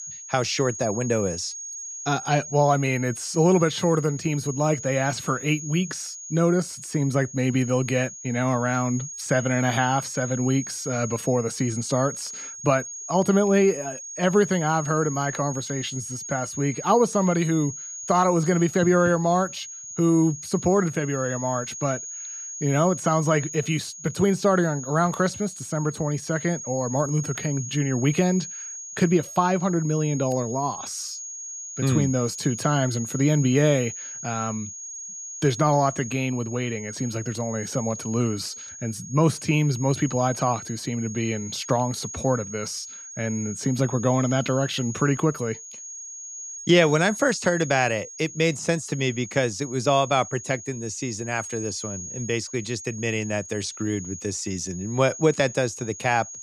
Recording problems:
high-pitched whine; noticeable; throughout; 6.5 kHz, 10 dB below the speech

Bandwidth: 14.5 kHz